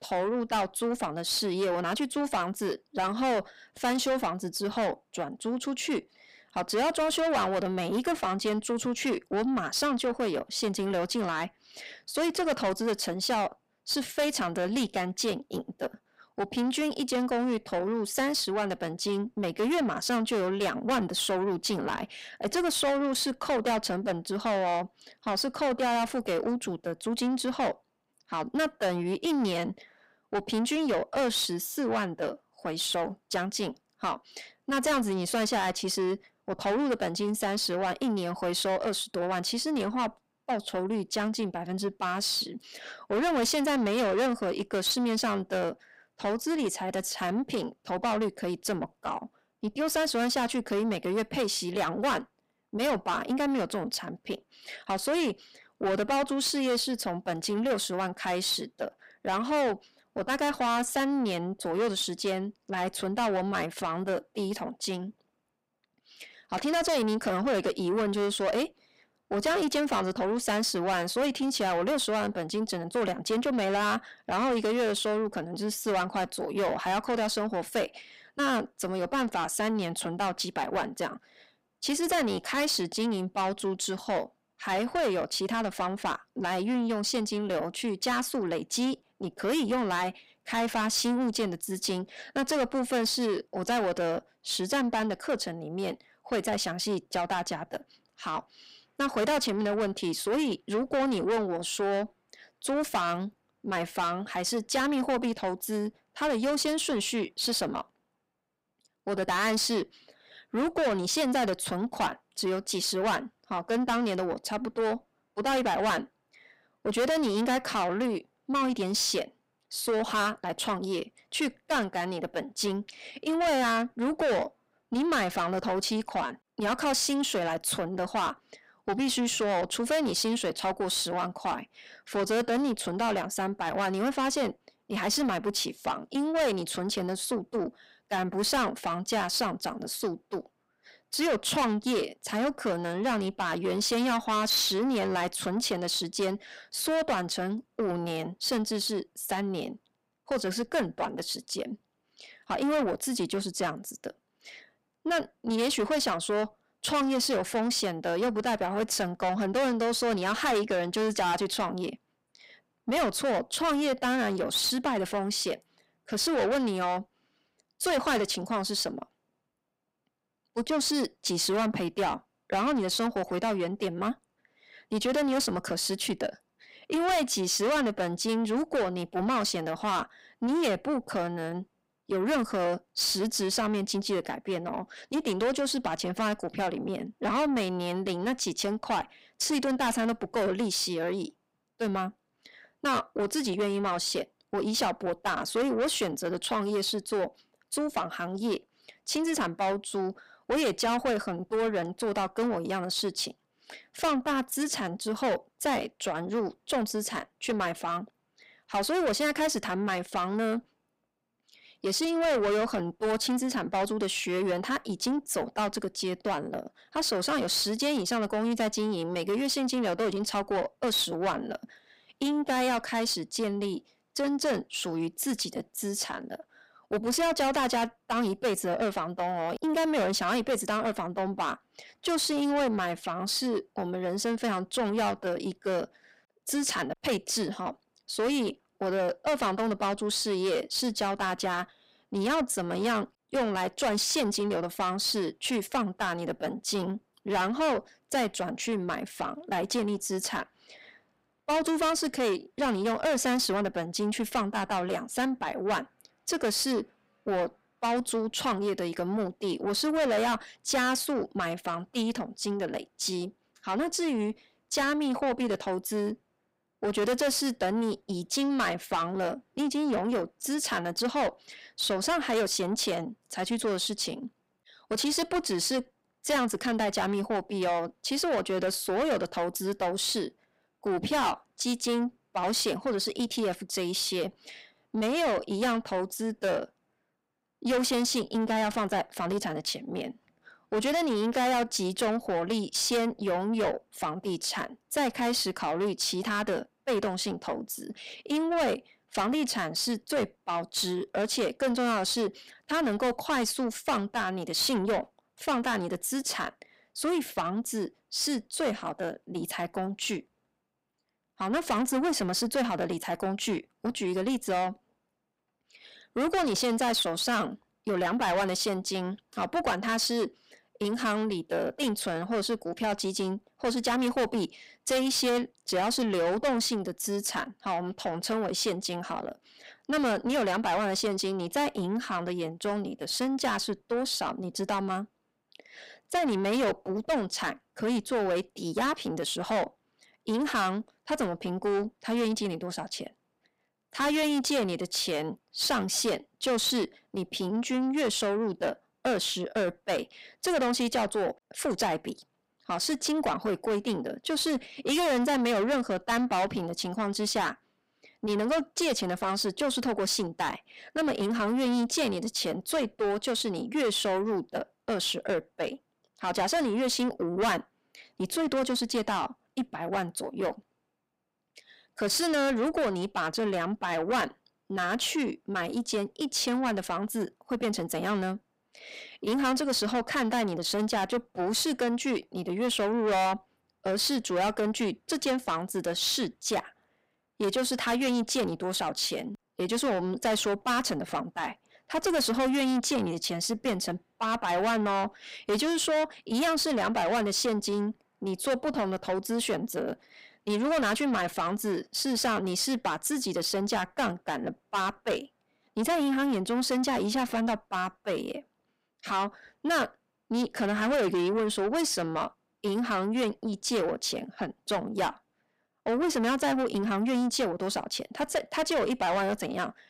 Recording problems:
distortion; heavy; 6 dB below the speech

